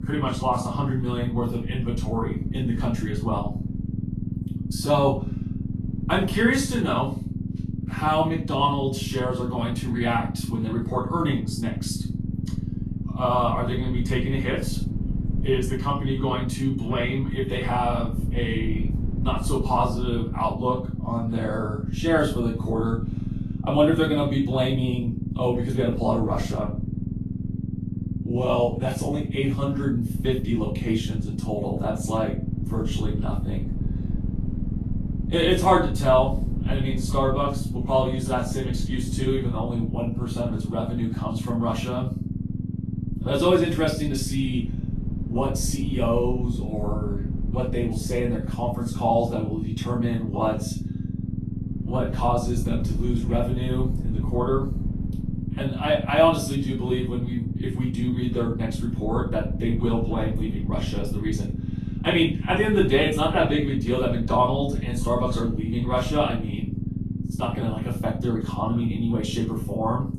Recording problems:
off-mic speech; far
room echo; slight; dies away in 0.3 s
garbled, watery; slightly; nothing above 12.5 kHz
low rumble; noticeable; throughout; 10 dB below the speech

